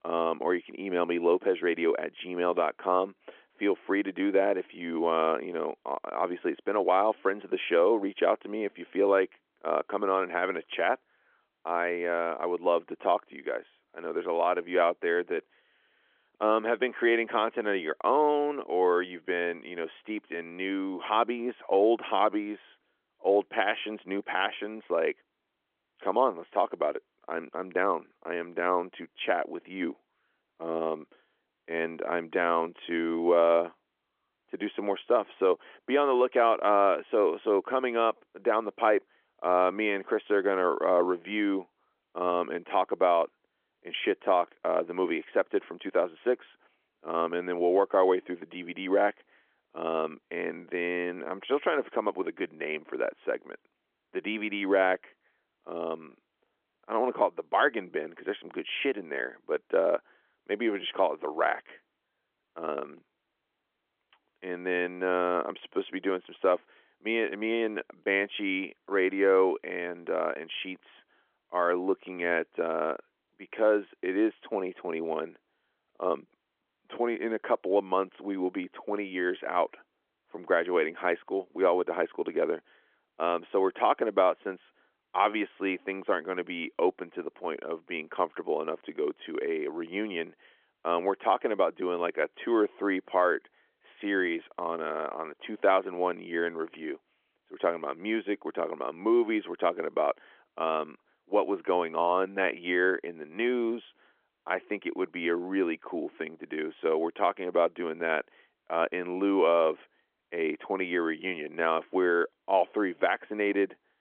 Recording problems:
phone-call audio; nothing above 3.5 kHz

